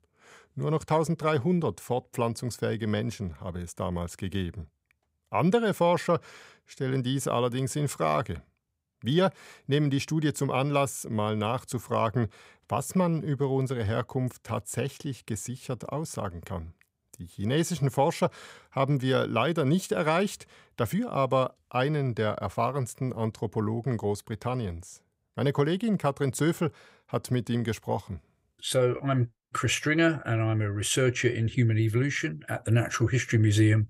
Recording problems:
none

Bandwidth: 15.5 kHz